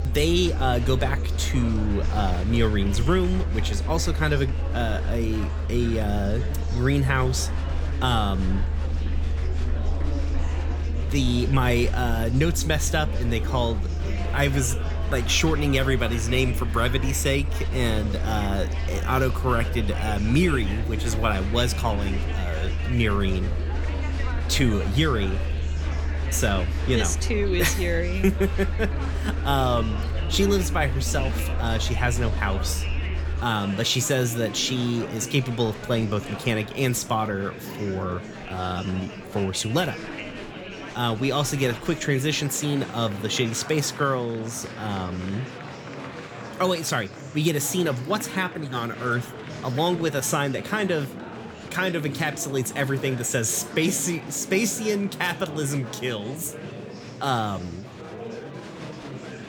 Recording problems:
murmuring crowd; noticeable; throughout; 10 dB below the speech
low rumble; faint; until 33 s; 20 dB below the speech

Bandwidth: 18.5 kHz